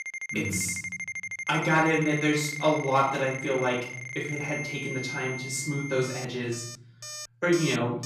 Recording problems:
off-mic speech; far
room echo; noticeable; dies away in 0.9 s
alarms or sirens; loud; throughout; 7 dB below the speech

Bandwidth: 14.5 kHz